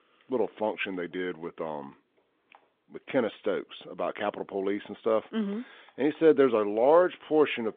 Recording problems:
phone-call audio
traffic noise; very faint; until 2 s; 40 dB below the speech

